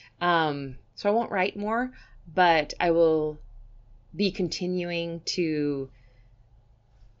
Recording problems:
high frequencies cut off; noticeable; nothing above 7 kHz

